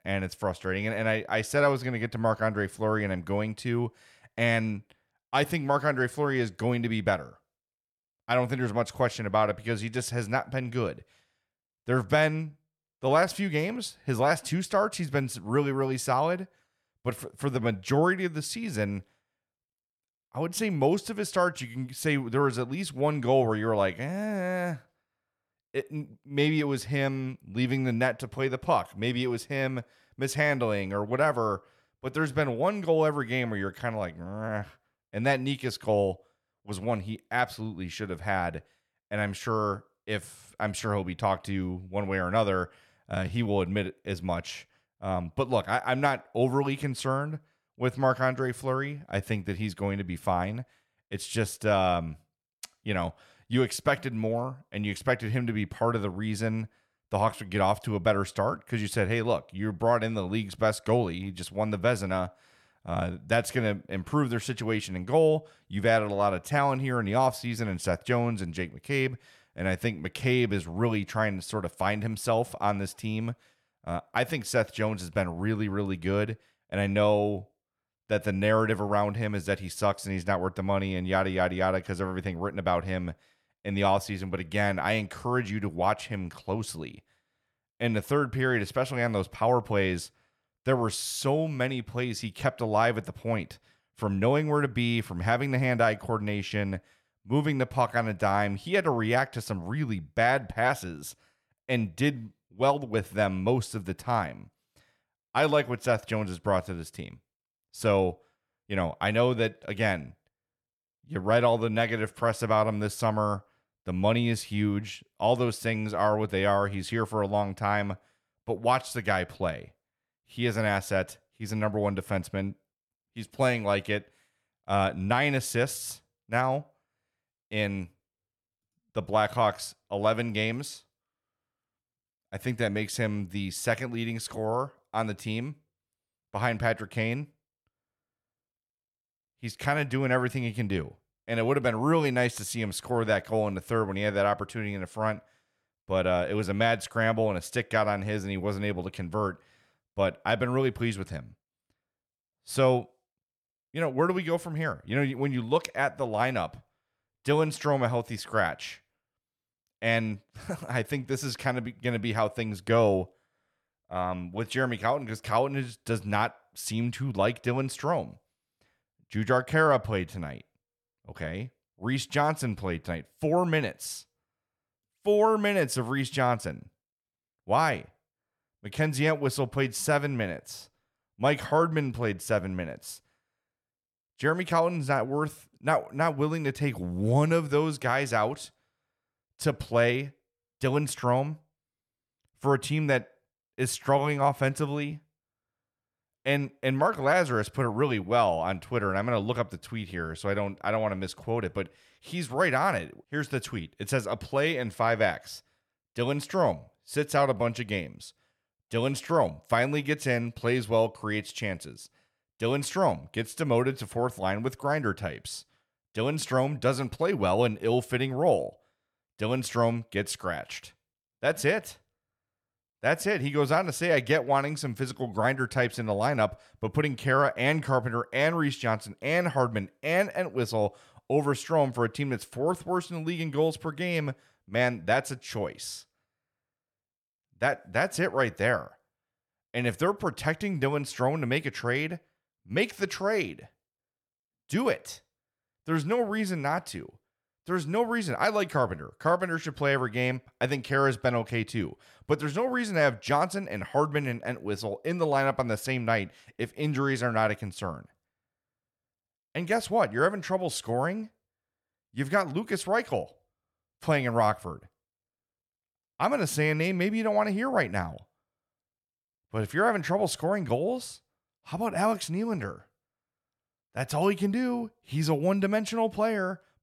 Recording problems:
none

